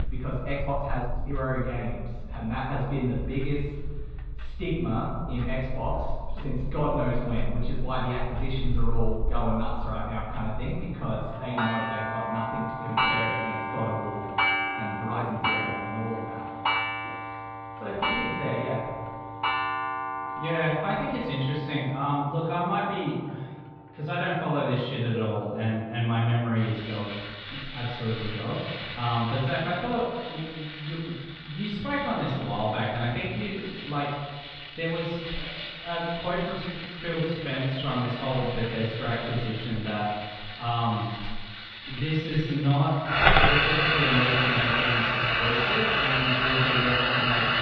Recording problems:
off-mic speech; far
room echo; noticeable; dies away in 1.3 s
muffled; slightly; fading above 4 kHz
household noises; very loud; throughout; 1 dB above the speech
uneven, jittery; strongly; from 0.5 to 43 s

